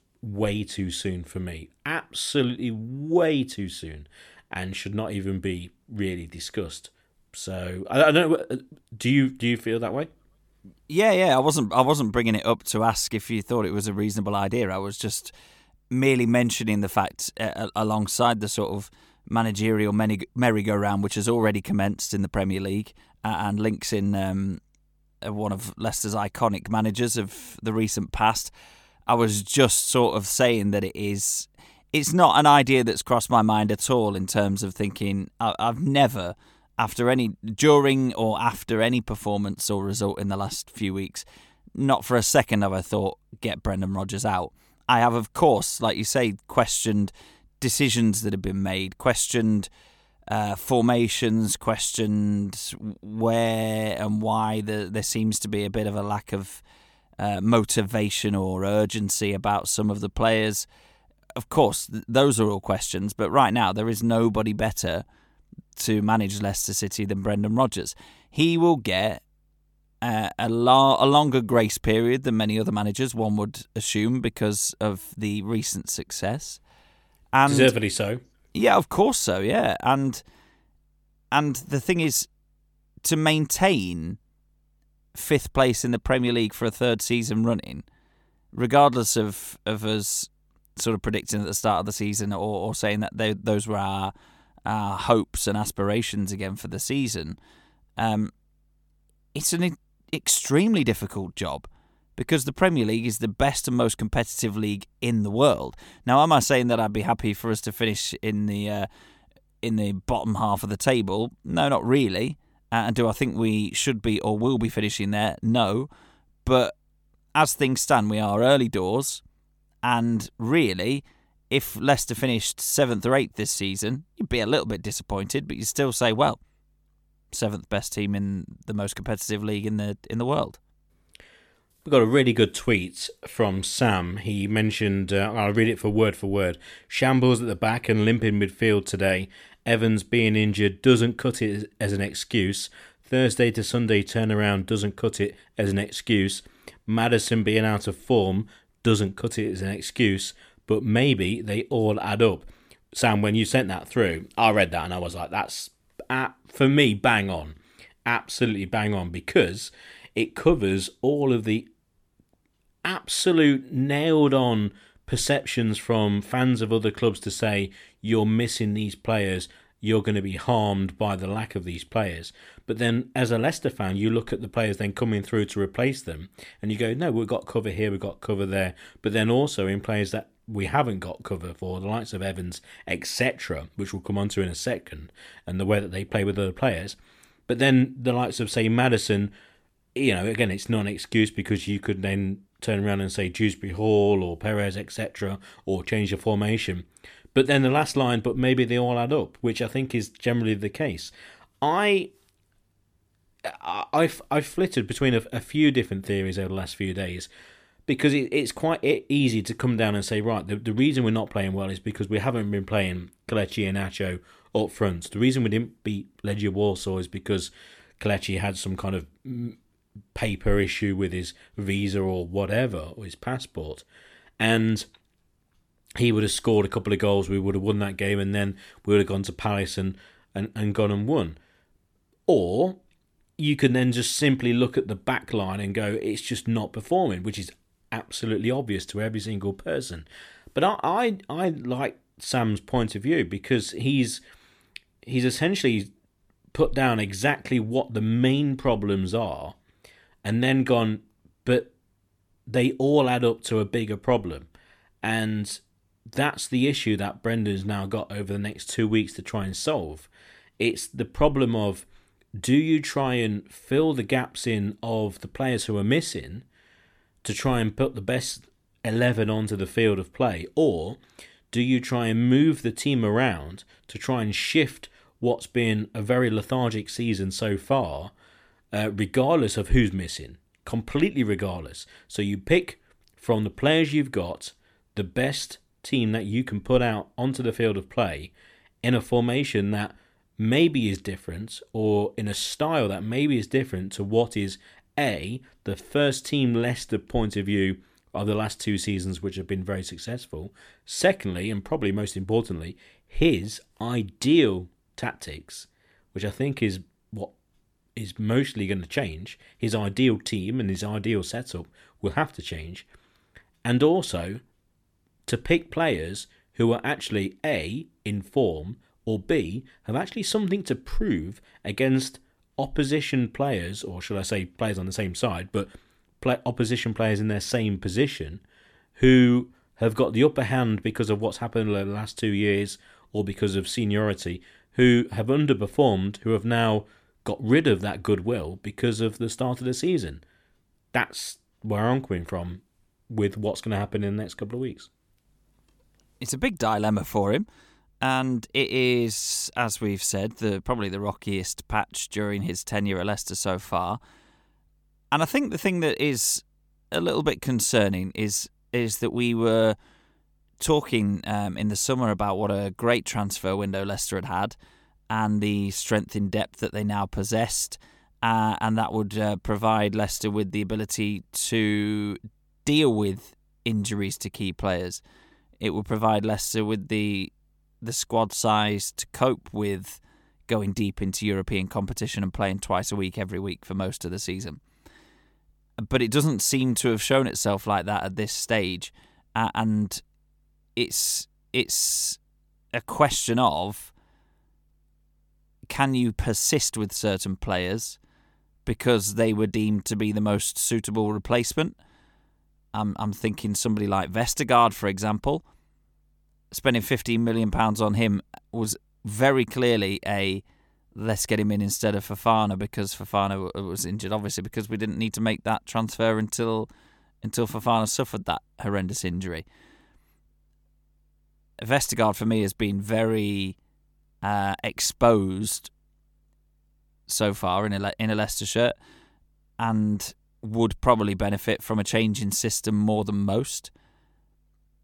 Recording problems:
none

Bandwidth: 18 kHz